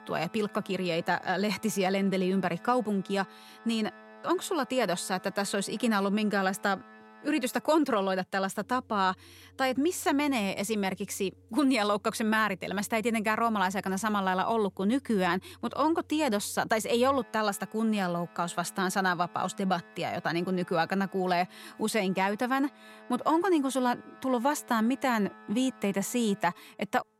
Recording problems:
background music; faint; throughout; 25 dB below the speech

